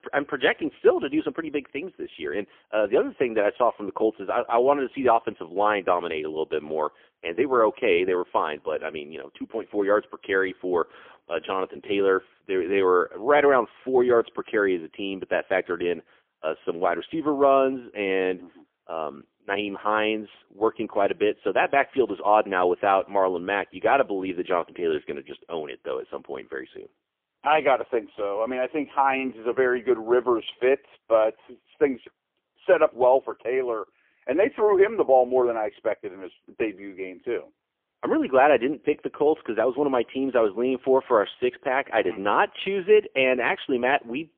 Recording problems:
phone-call audio; poor line; nothing above 3.5 kHz

